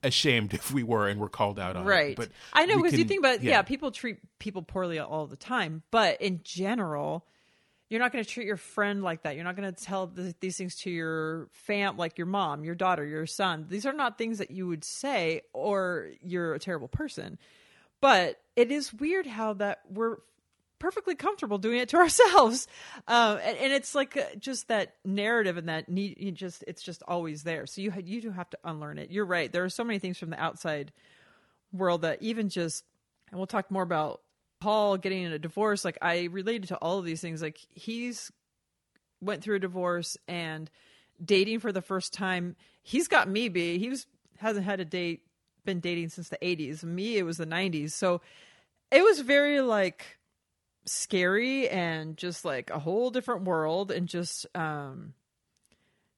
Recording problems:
none

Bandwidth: 18.5 kHz